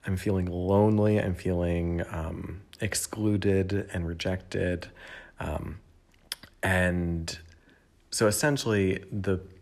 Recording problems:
none

